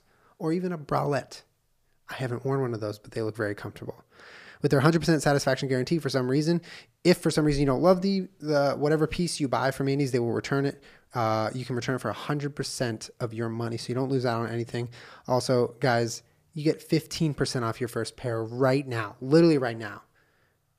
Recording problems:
none

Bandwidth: 15 kHz